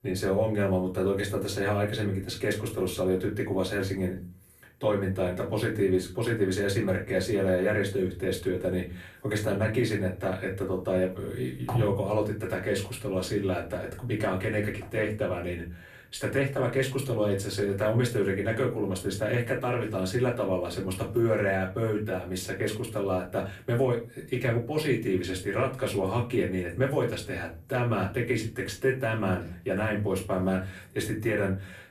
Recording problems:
off-mic speech; far
room echo; very slight; dies away in 0.3 s

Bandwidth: 14.5 kHz